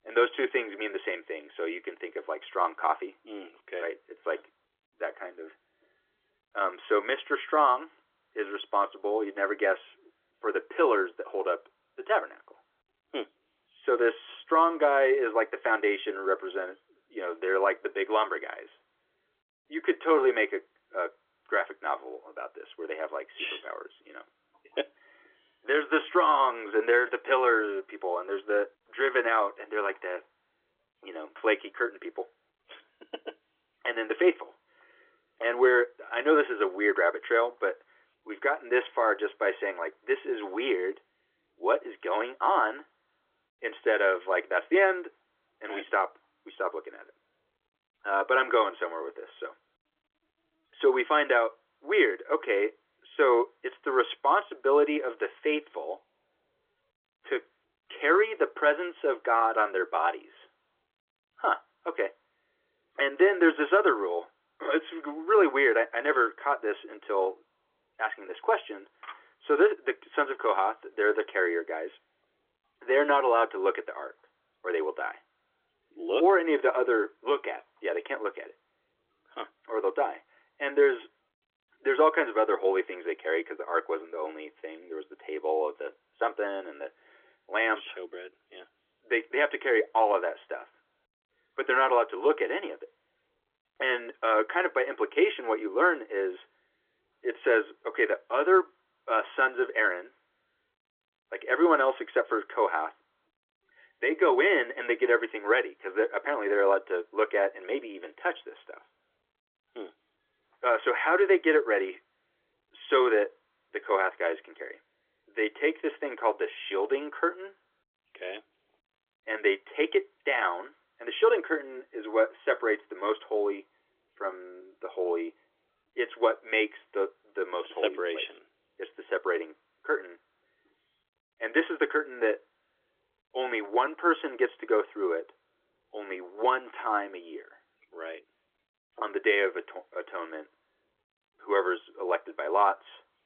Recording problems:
phone-call audio; nothing above 3.5 kHz

